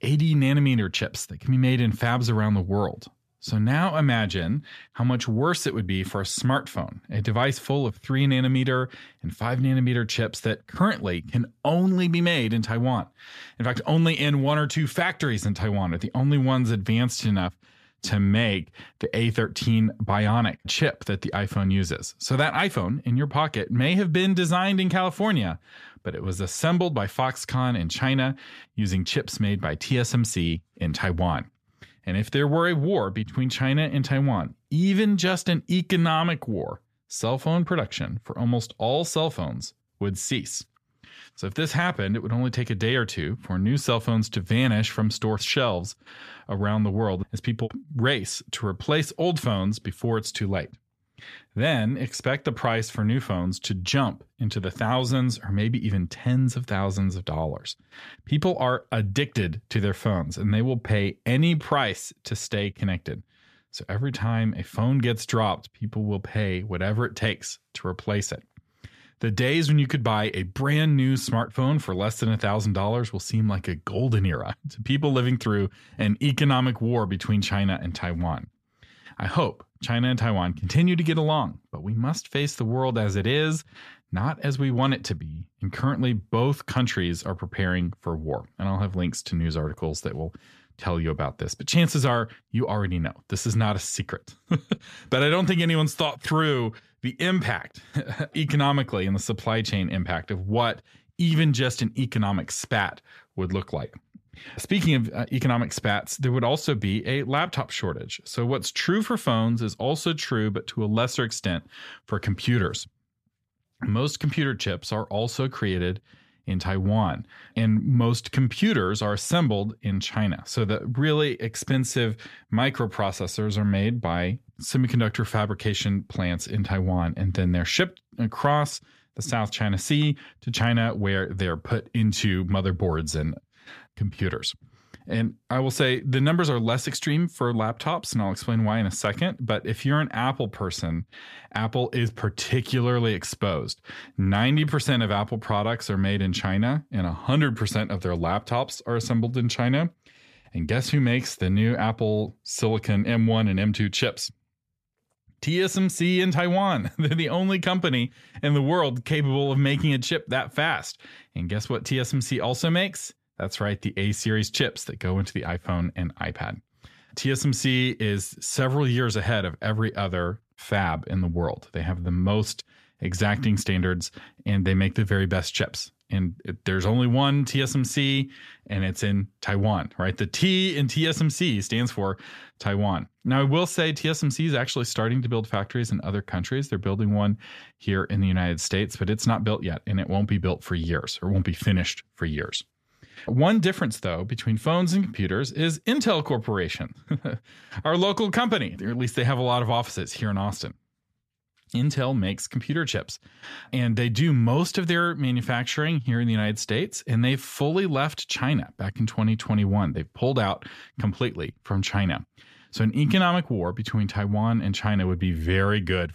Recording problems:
none

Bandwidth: 14.5 kHz